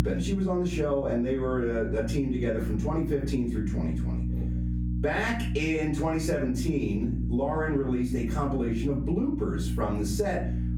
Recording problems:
off-mic speech; far
room echo; slight; dies away in 0.4 s
squashed, flat; somewhat
electrical hum; noticeable; throughout; 60 Hz, 15 dB below the speech

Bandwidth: 18.5 kHz